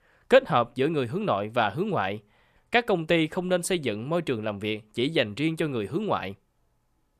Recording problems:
none

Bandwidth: 14.5 kHz